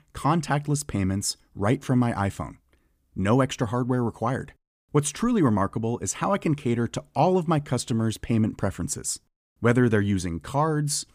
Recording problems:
none

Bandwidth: 15 kHz